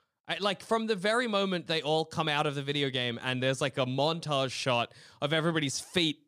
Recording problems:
none

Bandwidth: 15 kHz